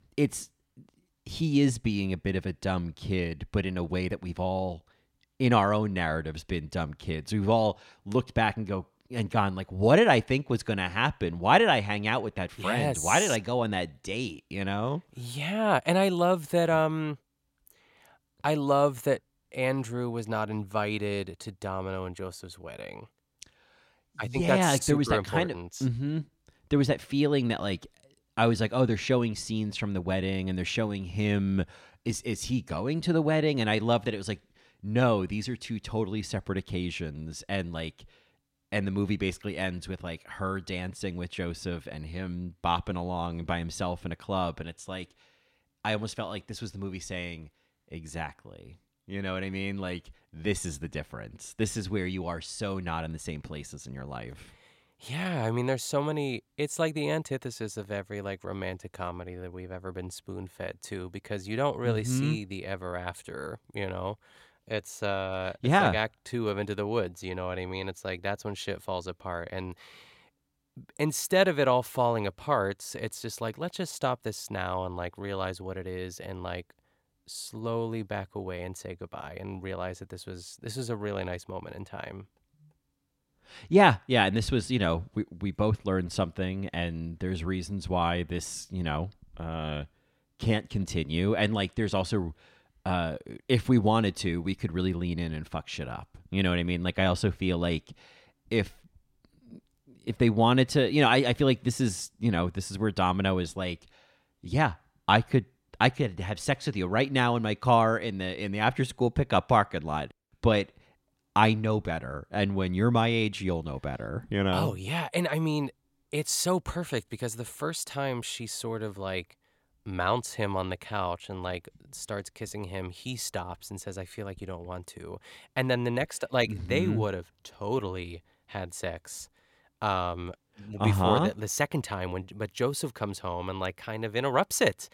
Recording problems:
none

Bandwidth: 16.5 kHz